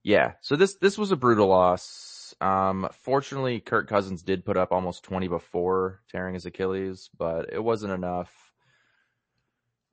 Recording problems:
garbled, watery; slightly; nothing above 8 kHz
audio stuttering; at 2 s

